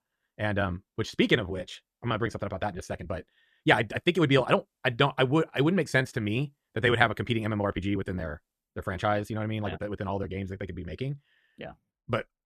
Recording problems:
wrong speed, natural pitch; too fast; 1.6 times normal speed

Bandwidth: 14.5 kHz